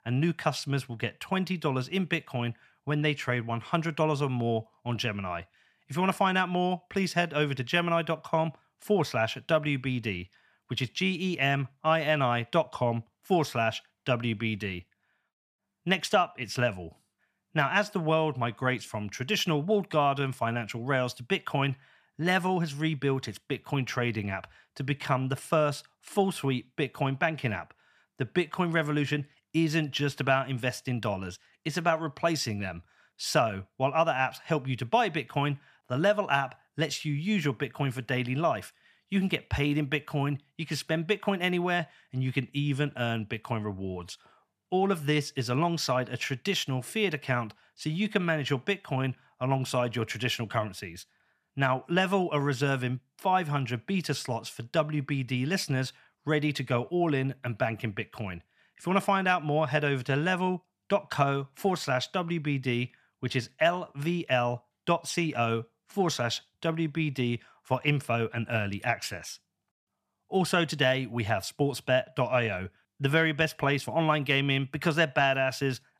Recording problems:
none

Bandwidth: 14 kHz